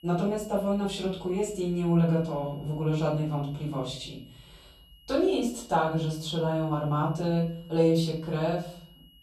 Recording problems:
off-mic speech; far
room echo; slight; dies away in 0.7 s
high-pitched whine; faint; throughout; 3 kHz, 30 dB below the speech

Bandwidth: 13.5 kHz